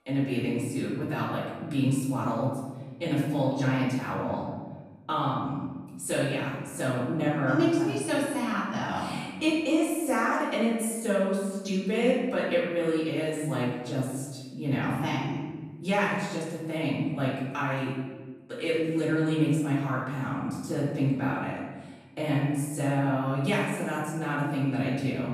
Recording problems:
off-mic speech; far
room echo; noticeable; dies away in 1.2 s

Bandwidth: 14.5 kHz